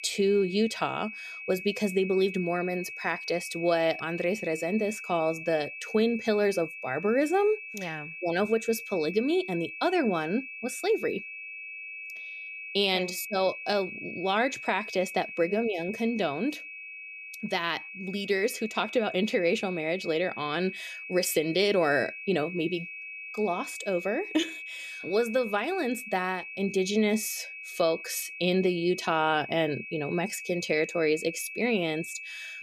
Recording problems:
high-pitched whine; loud; throughout; 2.5 kHz, 10 dB below the speech

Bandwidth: 14.5 kHz